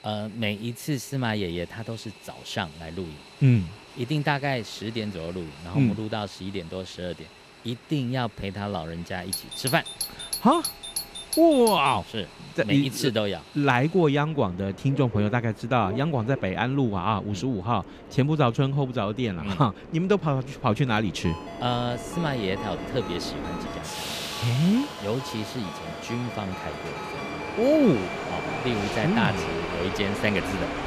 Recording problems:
train or aircraft noise; noticeable; throughout; 10 dB below the speech
doorbell; noticeable; from 9.5 to 12 s; peak 3 dB below the speech
phone ringing; faint; from 21 to 28 s; peak 15 dB below the speech

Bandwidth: 14.5 kHz